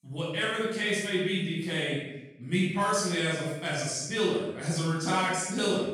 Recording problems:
room echo; strong; dies away in 0.9 s
off-mic speech; far

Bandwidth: 17 kHz